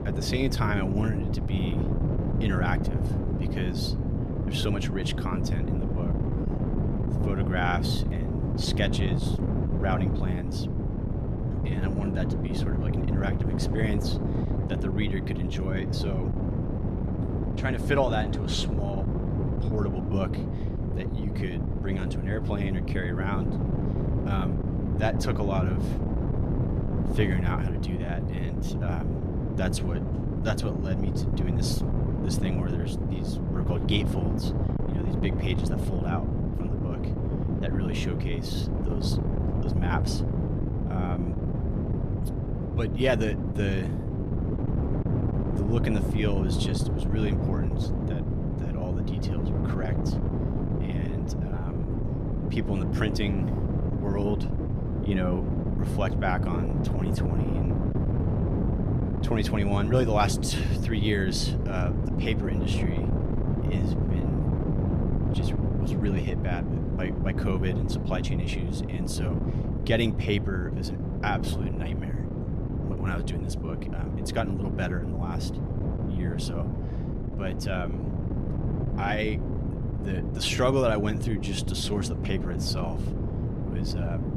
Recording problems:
wind noise on the microphone; heavy; 3 dB below the speech

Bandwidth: 14.5 kHz